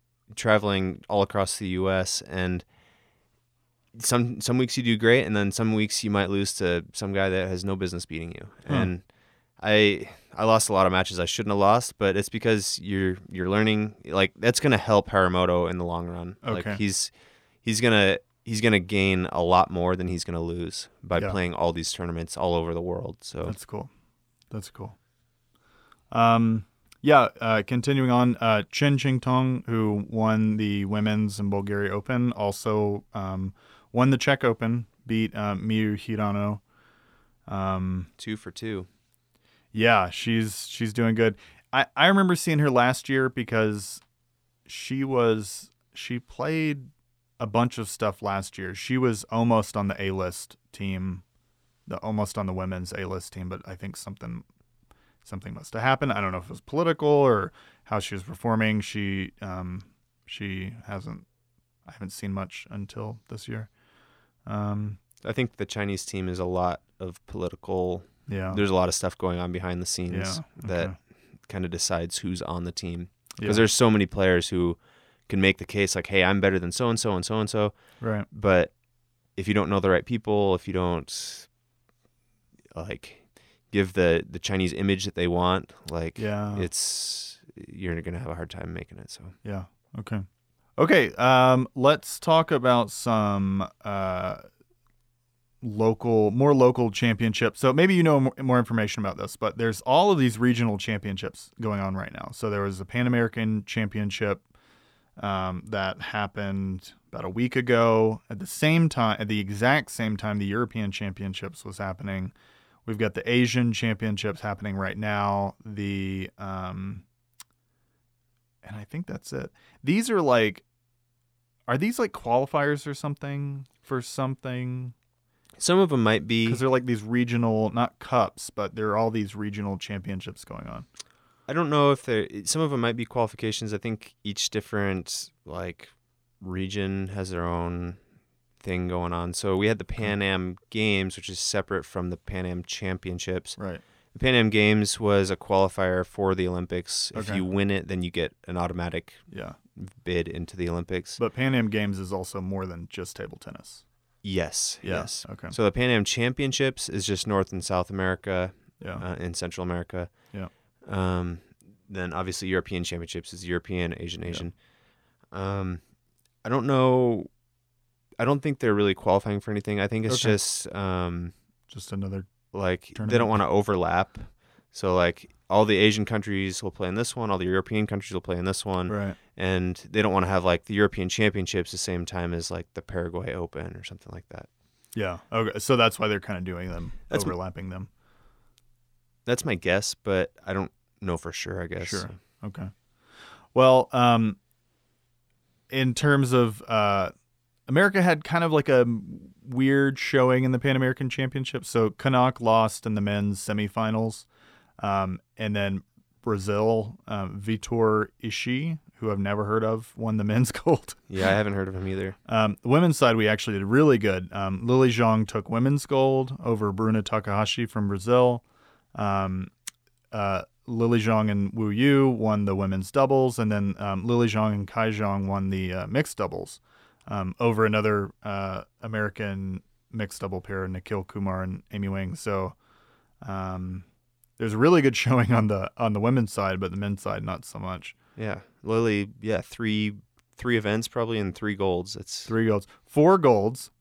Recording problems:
none

